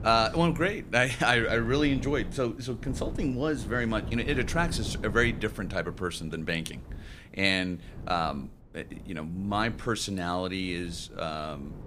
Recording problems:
wind noise on the microphone; occasional gusts; 20 dB below the speech

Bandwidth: 15 kHz